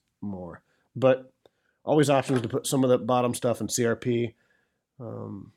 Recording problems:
none

